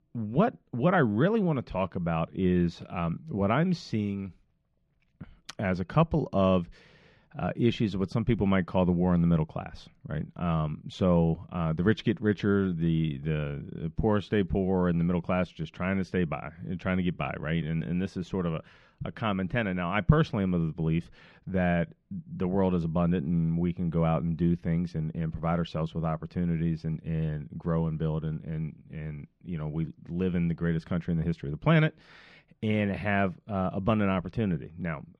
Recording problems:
muffled; very slightly; fading above 3.5 kHz

